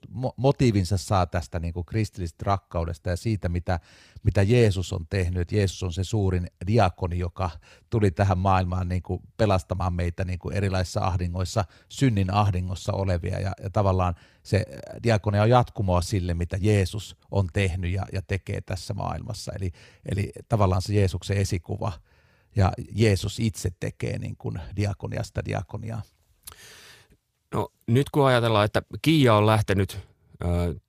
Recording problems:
none

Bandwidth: 15 kHz